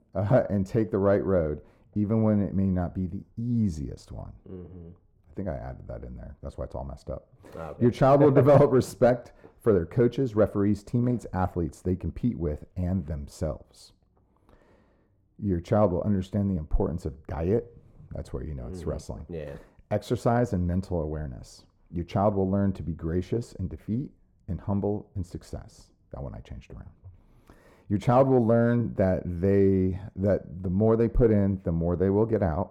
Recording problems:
muffled; very; fading above 1.5 kHz

